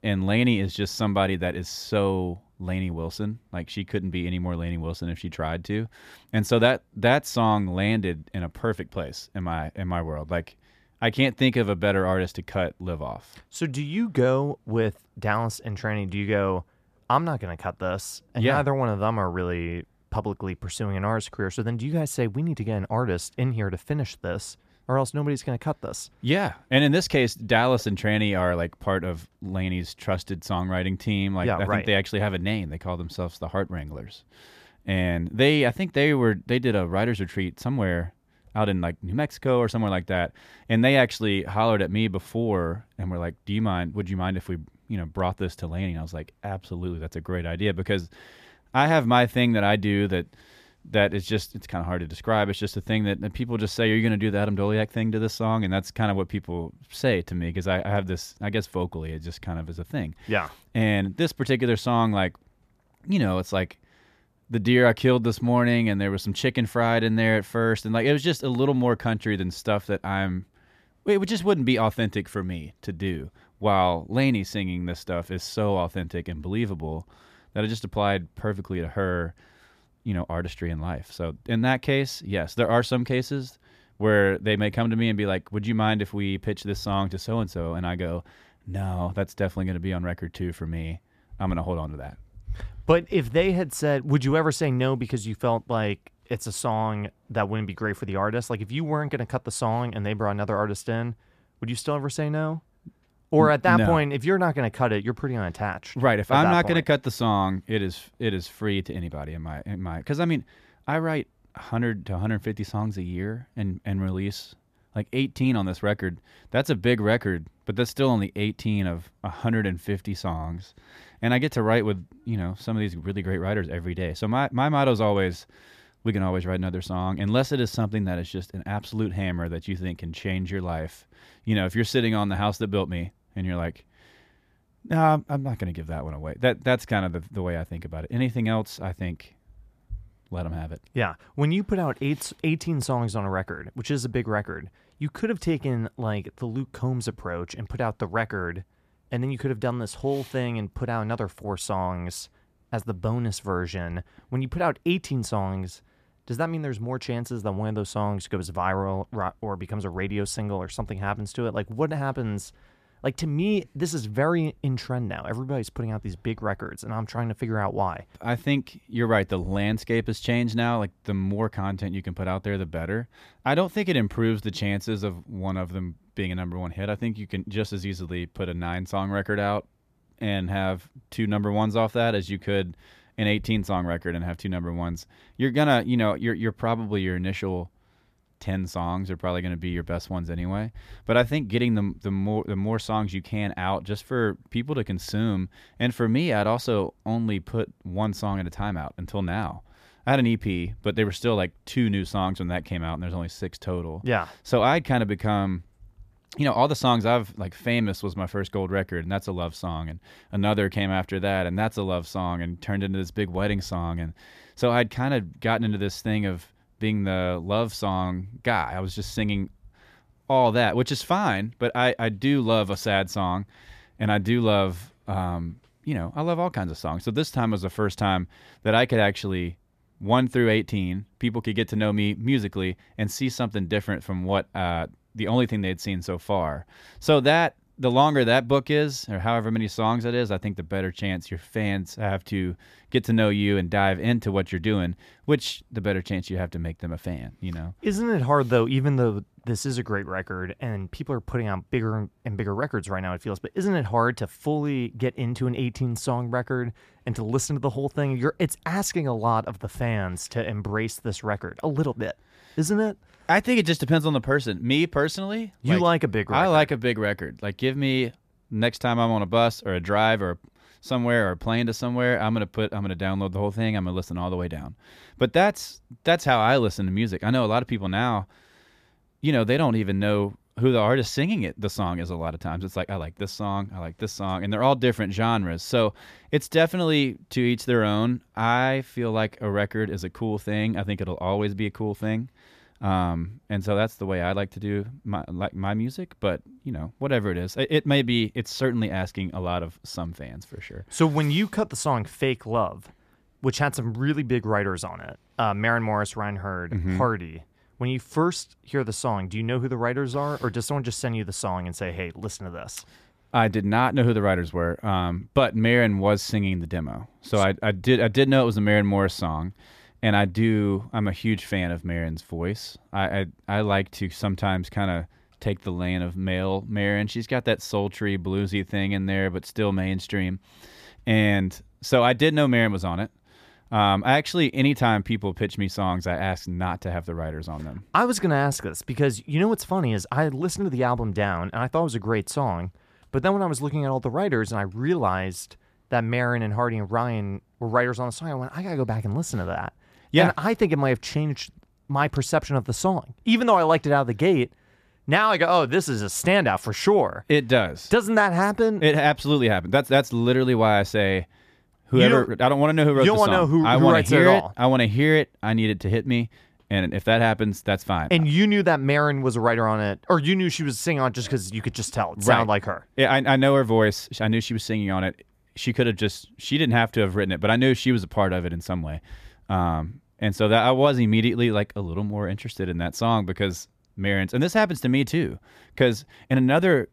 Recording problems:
none

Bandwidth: 14.5 kHz